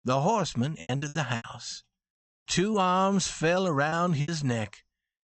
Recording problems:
high frequencies cut off; noticeable; nothing above 8 kHz
choppy; very; at 1 s and from 2.5 to 4.5 s; 11% of the speech affected

